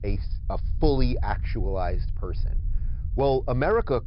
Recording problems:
high frequencies cut off; noticeable; nothing above 5.5 kHz
low rumble; faint; throughout; 25 dB below the speech

